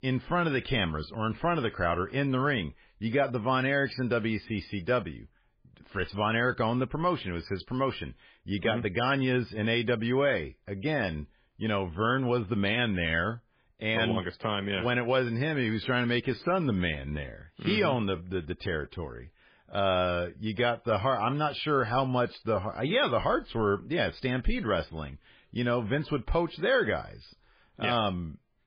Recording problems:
garbled, watery; badly; nothing above 5 kHz

